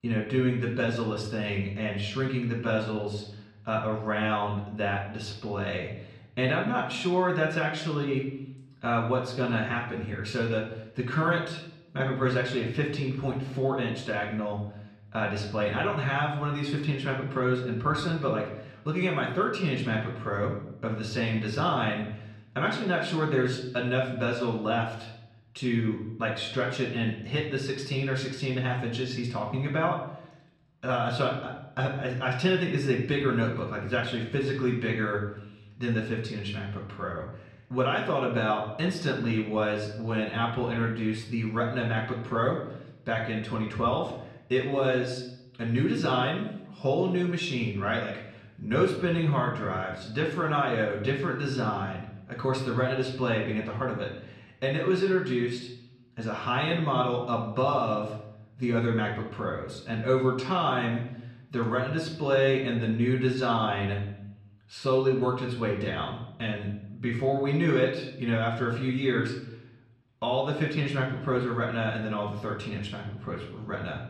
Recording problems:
off-mic speech; far
muffled; slightly; fading above 3 kHz
room echo; slight; dies away in 0.7 s

